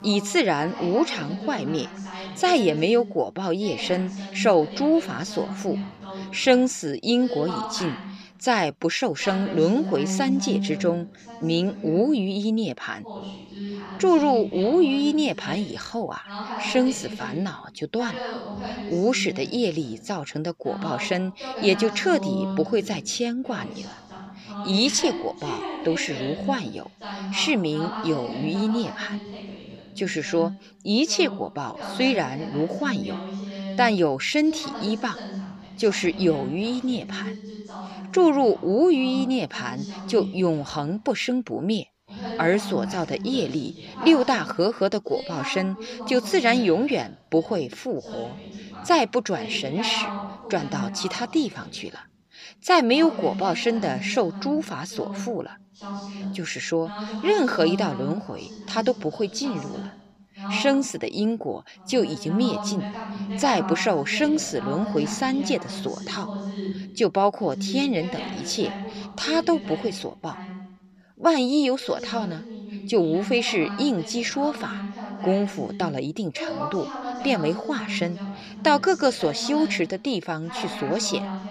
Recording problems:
voice in the background; loud; throughout; 10 dB below the speech

